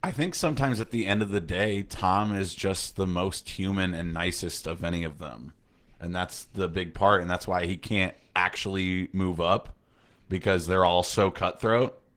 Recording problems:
garbled, watery; slightly; nothing above 17 kHz

